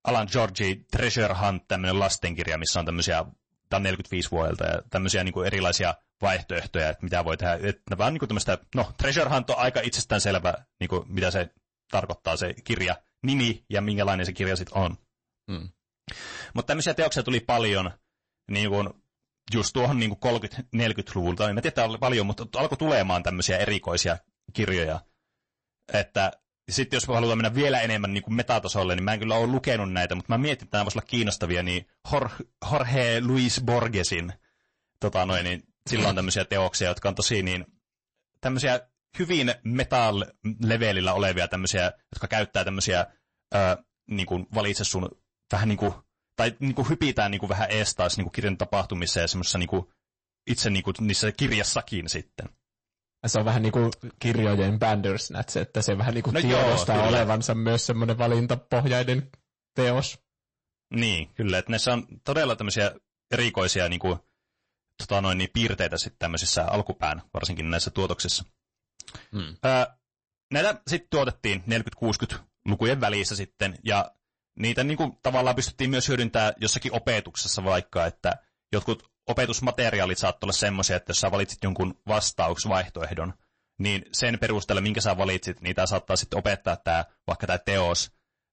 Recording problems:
distortion; slight; 6% of the sound clipped
garbled, watery; slightly; nothing above 8 kHz

